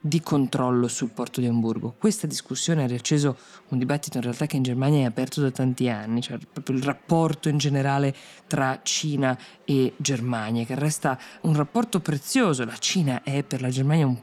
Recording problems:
chatter from many people; faint; throughout; 30 dB below the speech

